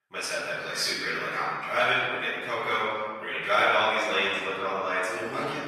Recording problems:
room echo; strong; dies away in 1.6 s
off-mic speech; far
thin; somewhat; fading below 1 kHz
garbled, watery; slightly; nothing above 14 kHz

